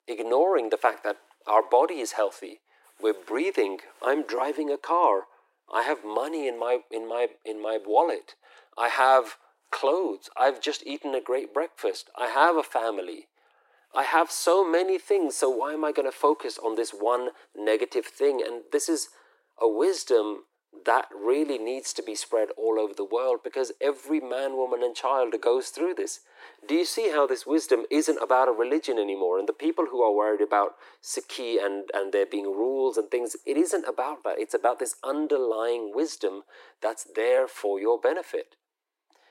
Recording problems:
thin; very; fading below 300 Hz

